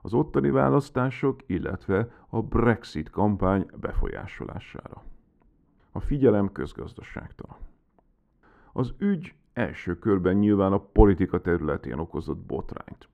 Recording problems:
muffled; very; fading above 3 kHz

